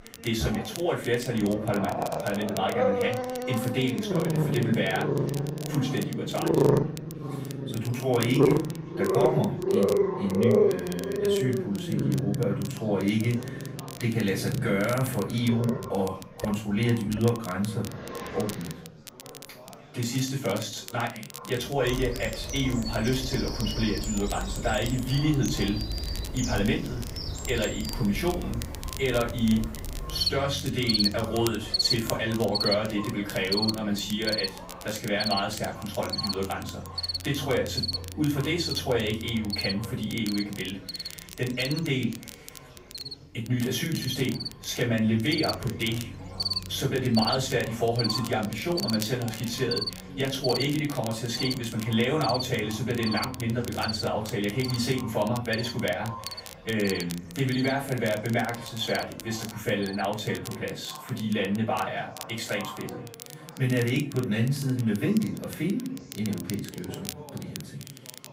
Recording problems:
off-mic speech; far
echo of what is said; faint; throughout; 430 ms later, 20 dB below the speech
room echo; slight; dies away in 0.3 s
animal sounds; loud; throughout; 2 dB below the speech
crackle, like an old record; noticeable; 15 dB below the speech
chatter from many people; faint; throughout; 20 dB below the speech

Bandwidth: 15.5 kHz